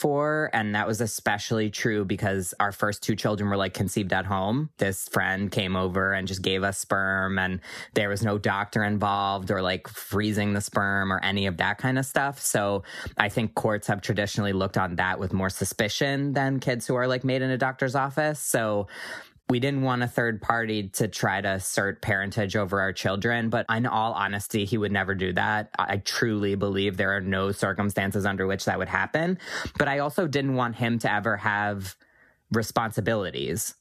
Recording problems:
squashed, flat; somewhat

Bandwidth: 14.5 kHz